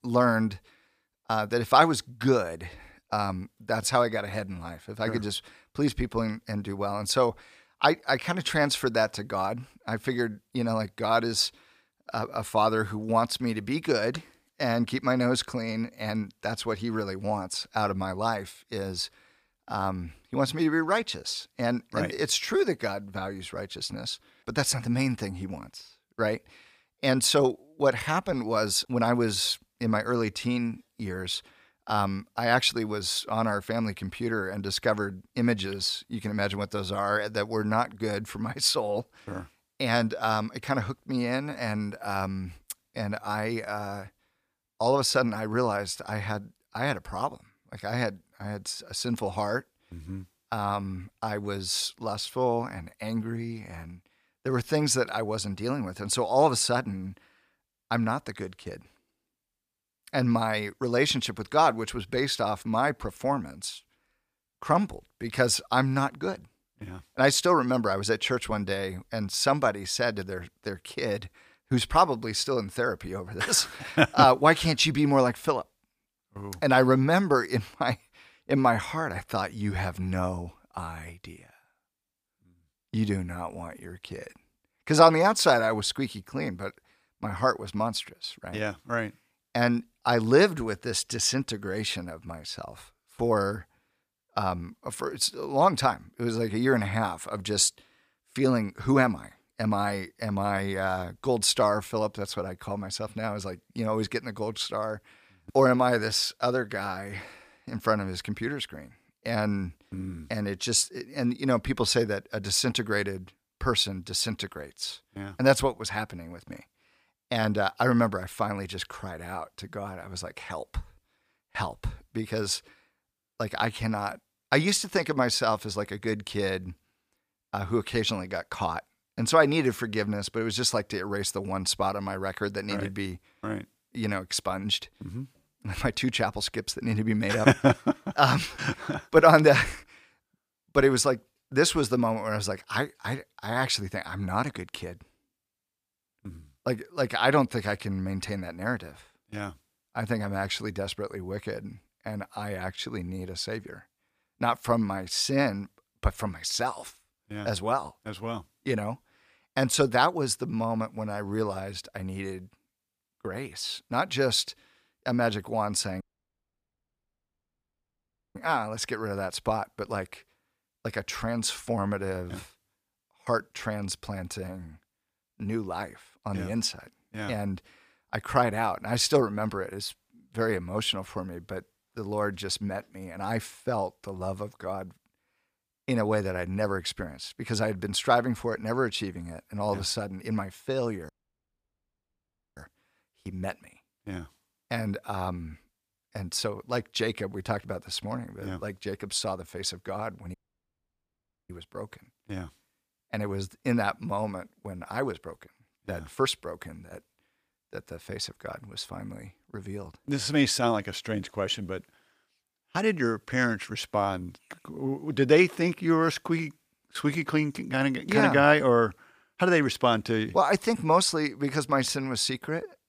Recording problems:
audio cutting out; at 2:46 for 2.5 s, at 3:11 for 1.5 s and at 3:20 for 1 s

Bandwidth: 15 kHz